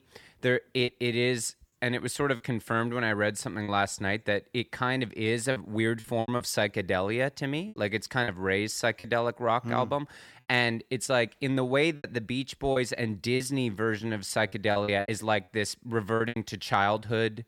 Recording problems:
choppy; very; 6% of the speech affected

